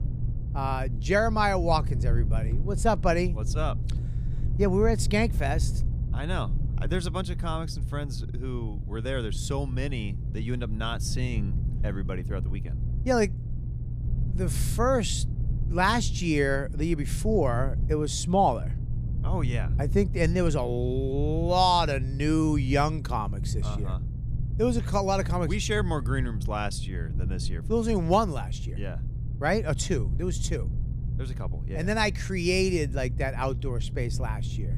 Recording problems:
low rumble; noticeable; throughout; 15 dB below the speech

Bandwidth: 15 kHz